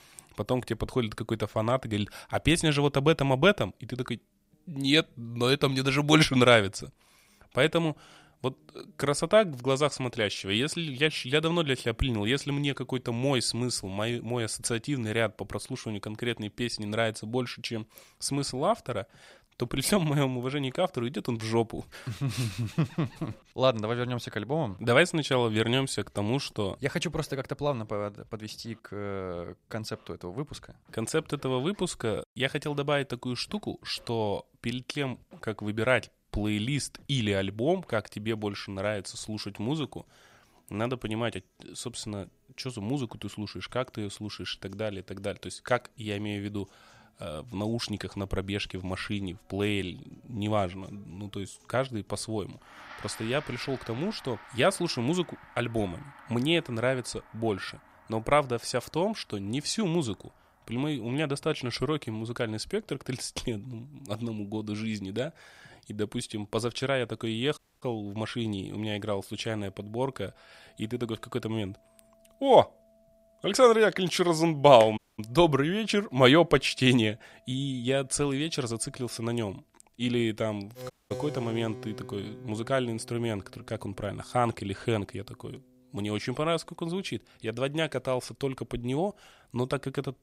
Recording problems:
background music; faint; throughout; 25 dB below the speech
audio cutting out; at 1:08, at 1:15 and at 1:21

